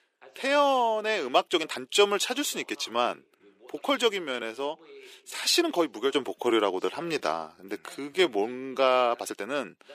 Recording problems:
thin; somewhat; fading below 350 Hz
voice in the background; faint; throughout; 30 dB below the speech
uneven, jittery; strongly; from 1.5 to 9.5 s

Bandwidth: 15 kHz